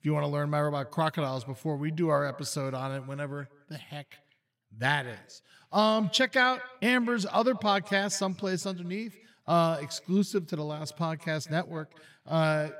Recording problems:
echo of what is said; faint; throughout; 180 ms later, 20 dB below the speech

